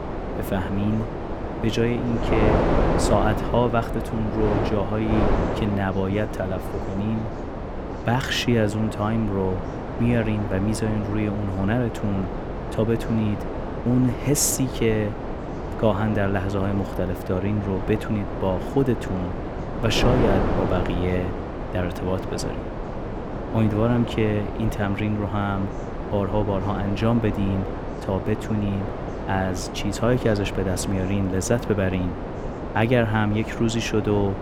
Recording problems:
wind noise on the microphone; heavy; 4 dB below the speech
chatter from many people; faint; throughout; 25 dB below the speech

